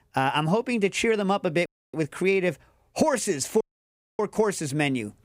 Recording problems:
audio cutting out; at 1.5 s and at 3.5 s for 0.5 s

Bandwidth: 15.5 kHz